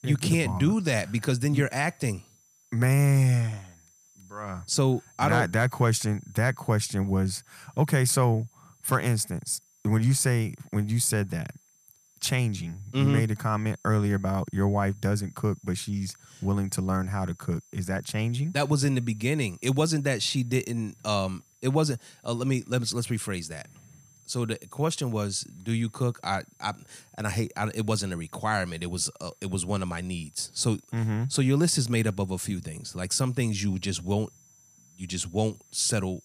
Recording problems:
high-pitched whine; faint; throughout; 6 kHz, 30 dB below the speech

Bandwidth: 14.5 kHz